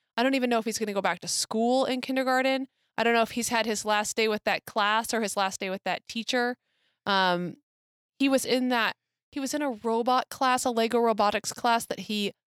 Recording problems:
none

